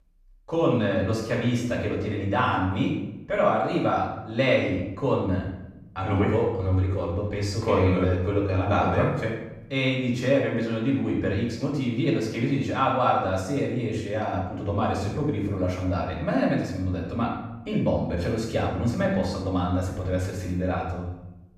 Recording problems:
off-mic speech; far
room echo; noticeable; dies away in 0.8 s

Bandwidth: 14.5 kHz